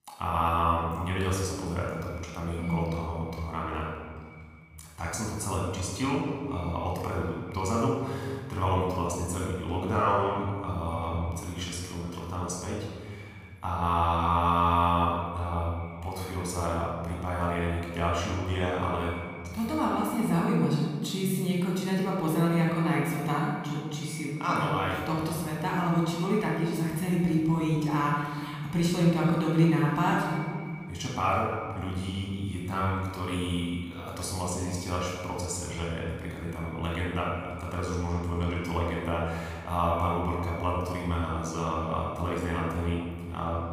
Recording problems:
off-mic speech; far
room echo; noticeable; dies away in 2.3 s
echo of what is said; faint; throughout; 490 ms later, 20 dB below the speech

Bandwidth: 15 kHz